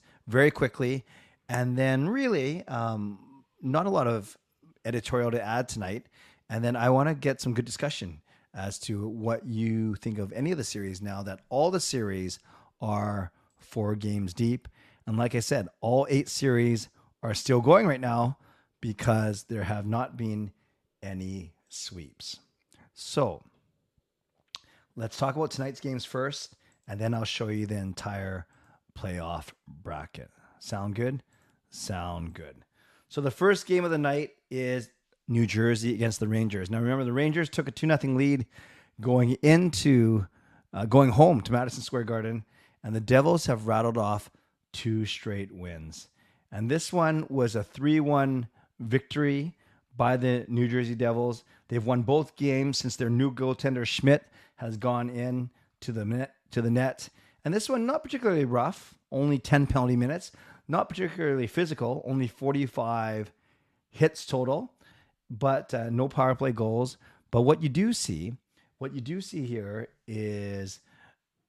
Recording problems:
none

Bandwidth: 13.5 kHz